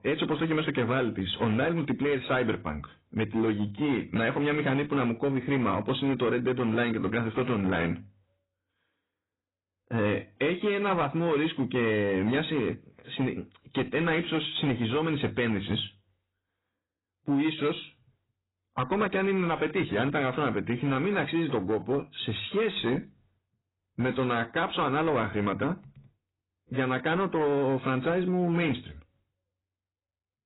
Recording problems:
garbled, watery; badly; nothing above 4 kHz
distortion; slight; 8% of the sound clipped

